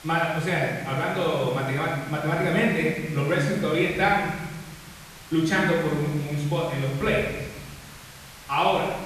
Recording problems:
off-mic speech; far
room echo; noticeable; dies away in 1.3 s
hiss; noticeable; throughout; 20 dB below the speech

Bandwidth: 14 kHz